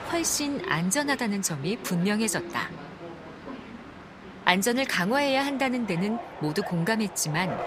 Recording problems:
train or aircraft noise; noticeable; throughout; 15 dB below the speech

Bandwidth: 15 kHz